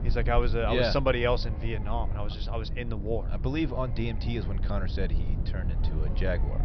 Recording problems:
high frequencies cut off; noticeable; nothing above 5.5 kHz
low rumble; noticeable; throughout; 15 dB below the speech

